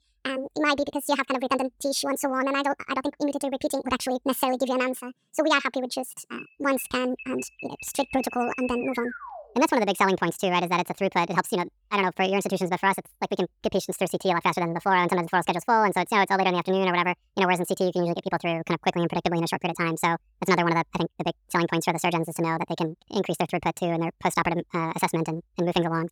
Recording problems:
wrong speed and pitch; too fast and too high; 1.6 times normal speed
alarm; faint; from 6.5 to 9.5 s; peak 10 dB below the speech

